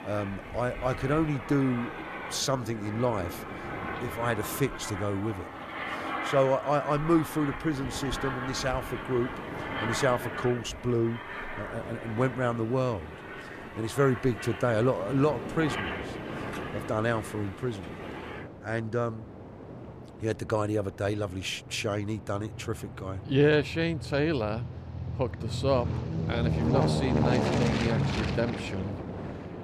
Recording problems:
train or aircraft noise; loud; throughout; 5 dB below the speech

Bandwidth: 14.5 kHz